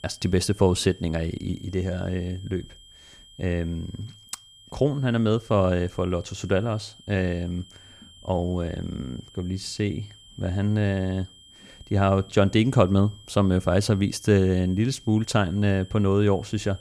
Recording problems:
high-pitched whine; faint; throughout; 3 kHz, 25 dB below the speech

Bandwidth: 14.5 kHz